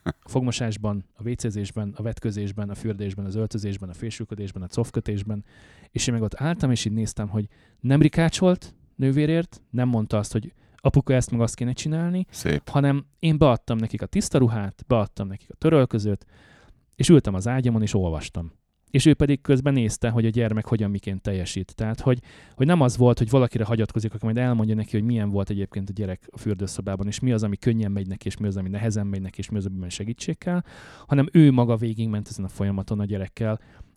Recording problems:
none

